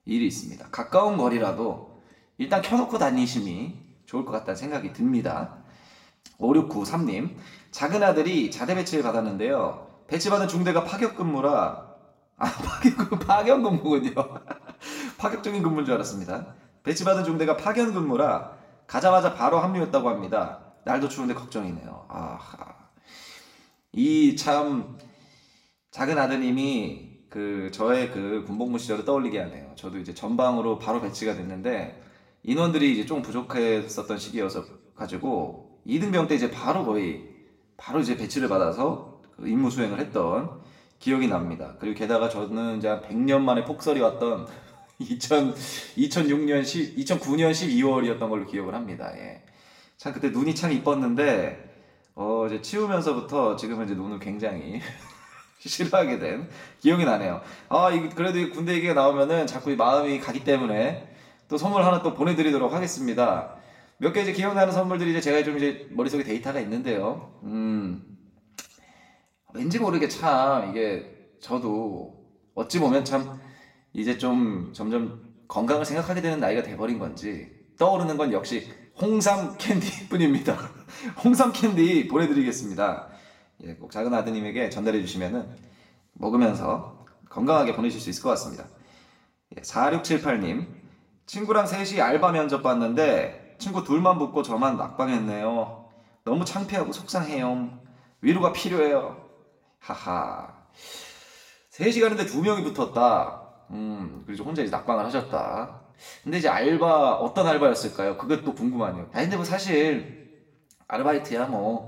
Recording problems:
room echo; slight; dies away in 0.7 s
off-mic speech; somewhat distant

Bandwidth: 16 kHz